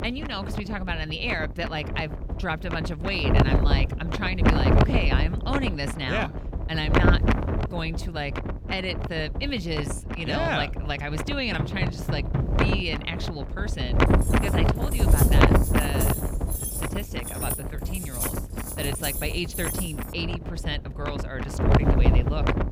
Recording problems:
wind noise on the microphone; heavy; as loud as the speech
door banging; loud; from 12 to 13 s; peak 1 dB above the speech
jangling keys; loud; from 14 to 20 s; peak 1 dB above the speech

